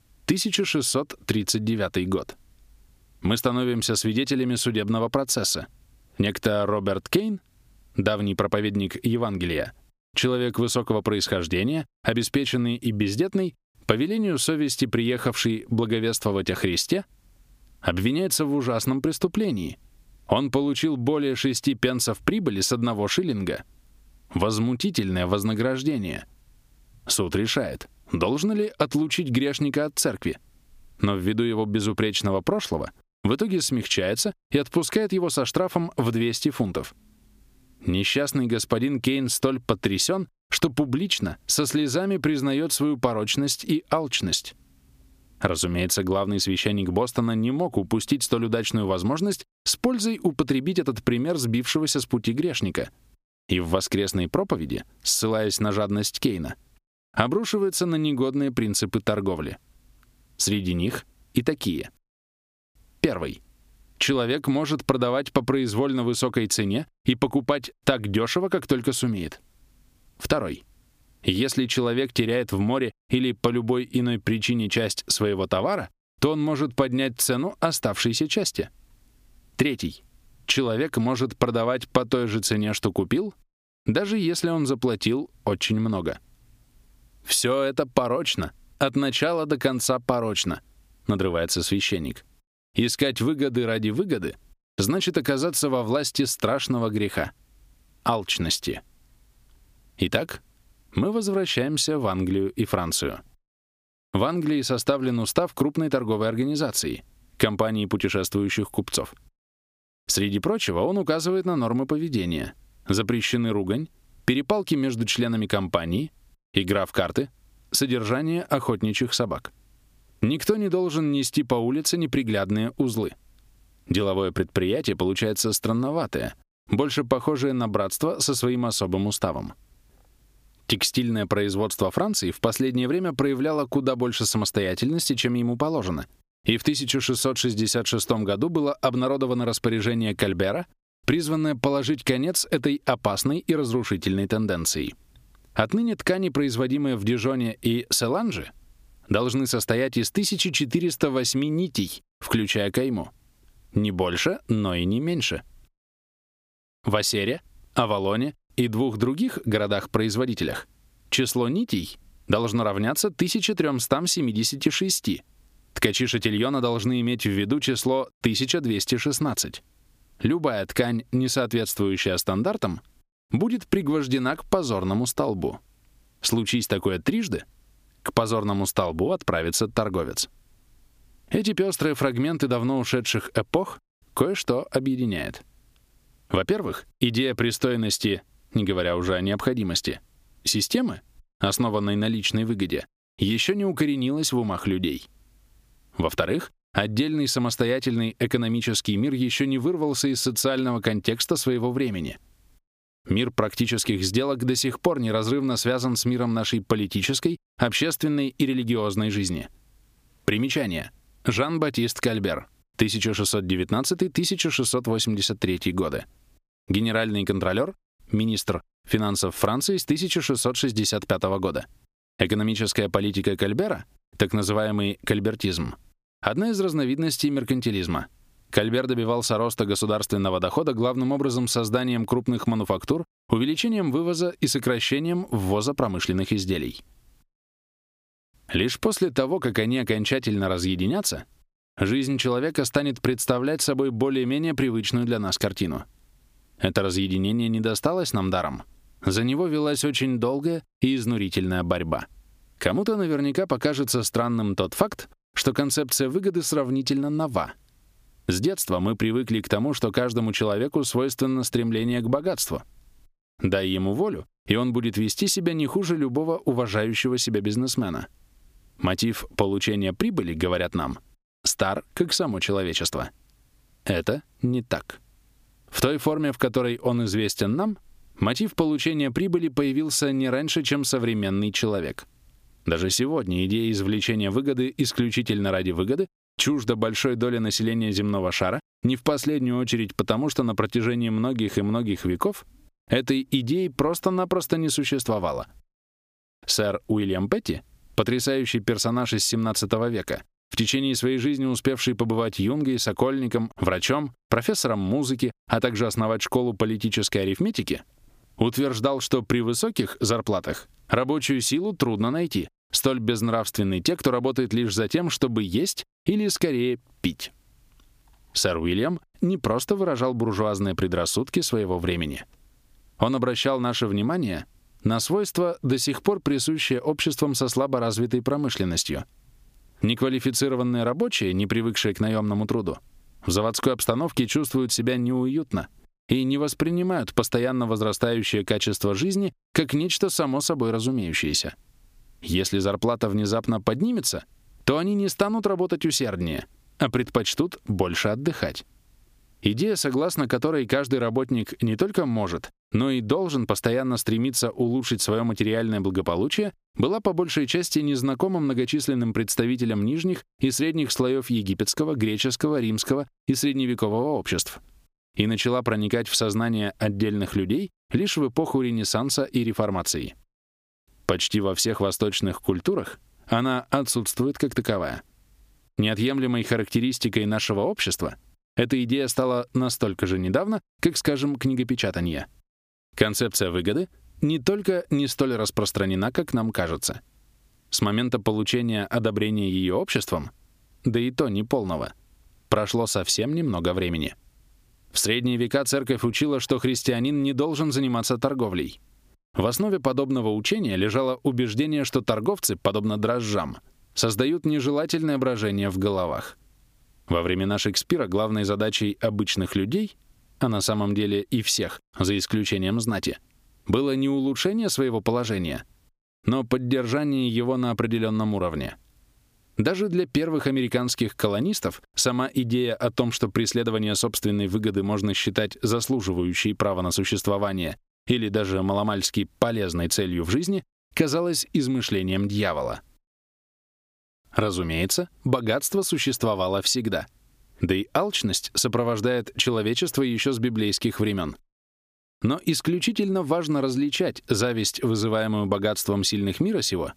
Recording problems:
squashed, flat; somewhat

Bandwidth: 15 kHz